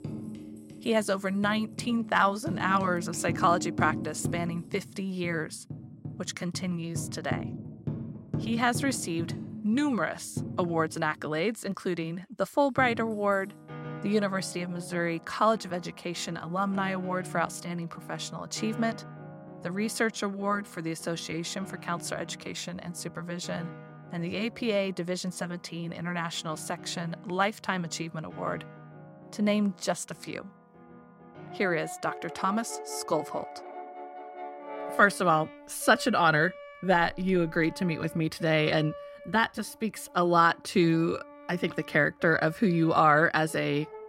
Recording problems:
background music; noticeable; throughout; 15 dB below the speech

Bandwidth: 16 kHz